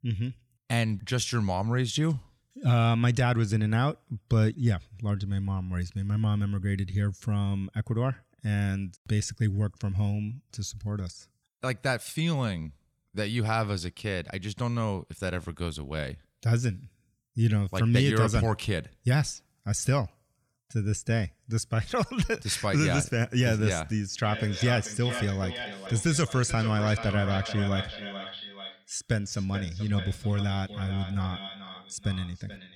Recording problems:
echo of what is said; strong; from 24 s on; 430 ms later, 10 dB below the speech

